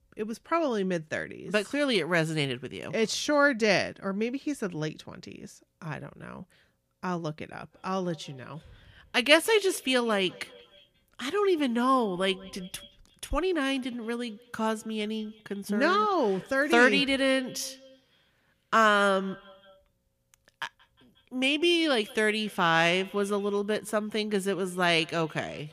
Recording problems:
echo of what is said; faint; from 7.5 s on; 180 ms later, 25 dB below the speech

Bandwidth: 15 kHz